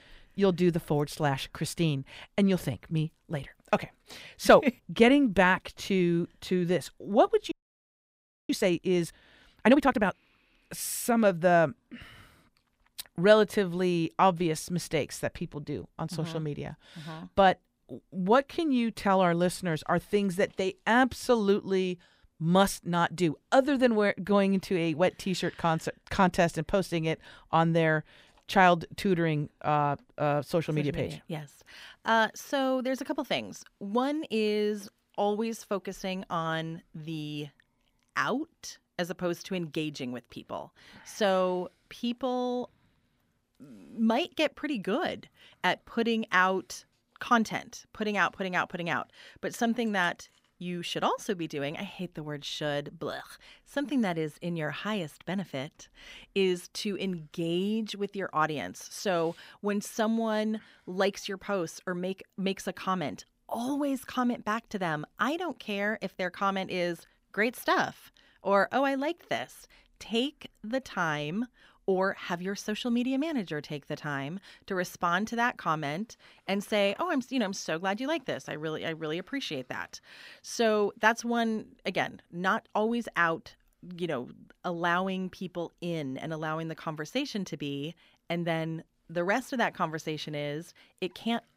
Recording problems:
audio freezing; at 7.5 s for 1 s

